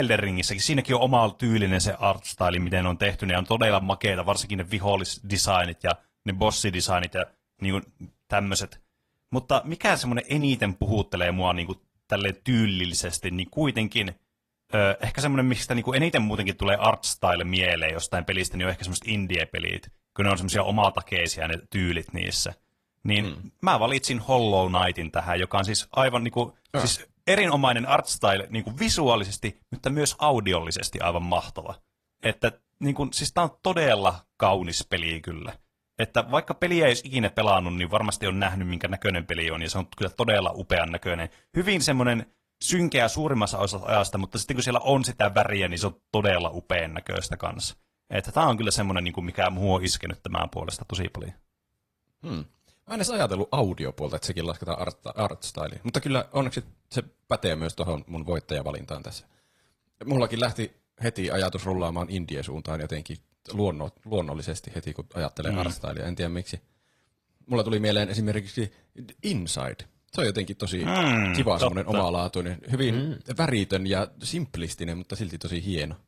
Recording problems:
garbled, watery; slightly
abrupt cut into speech; at the start

